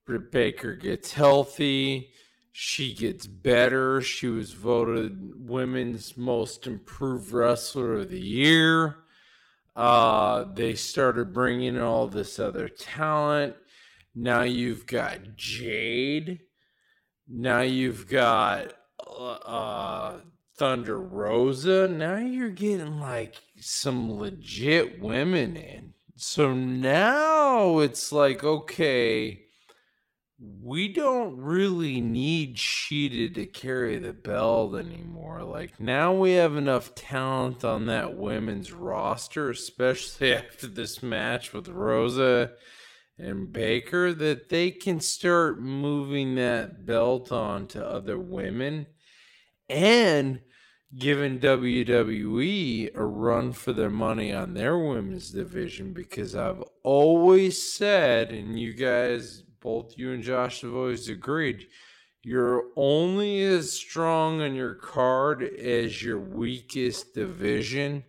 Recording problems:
wrong speed, natural pitch; too slow; 0.5 times normal speed

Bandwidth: 16.5 kHz